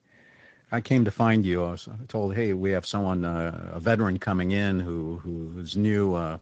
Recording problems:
garbled, watery; slightly

